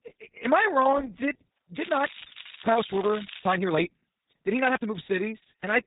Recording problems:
garbled, watery; badly; nothing above 4 kHz
high frequencies cut off; slight
crackling; noticeable; from 2 to 3.5 s; 15 dB below the speech
uneven, jittery; strongly; from 1 to 5 s

